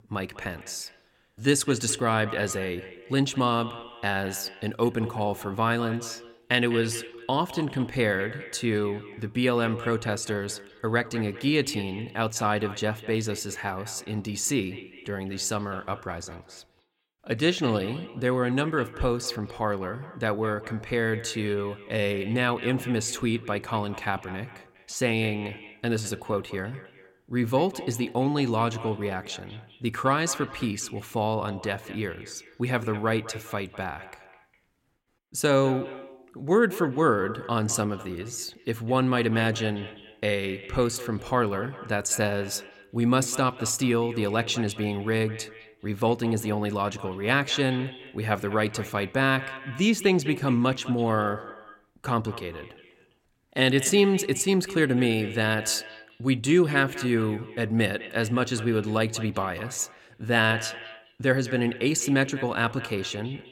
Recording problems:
echo of what is said; noticeable; throughout; 200 ms later, 15 dB below the speech

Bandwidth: 16.5 kHz